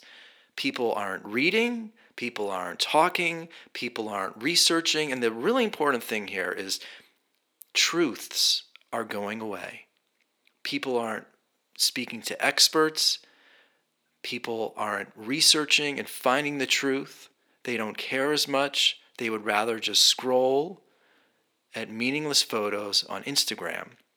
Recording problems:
thin; somewhat; fading below 300 Hz

